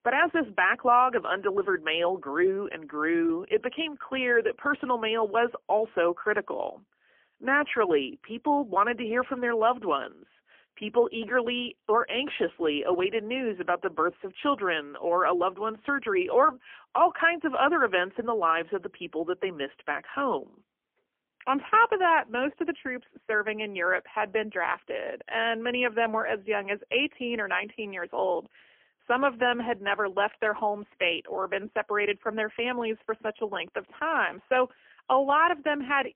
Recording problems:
phone-call audio; poor line; nothing above 3 kHz

